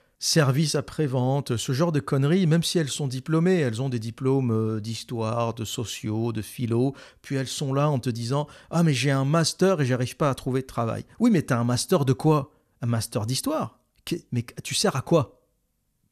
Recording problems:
none

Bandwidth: 14 kHz